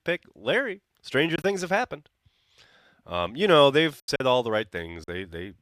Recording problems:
choppy; occasionally; 5% of the speech affected

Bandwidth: 14.5 kHz